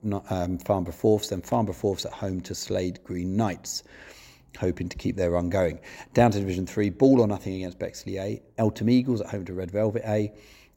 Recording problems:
none

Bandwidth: 16 kHz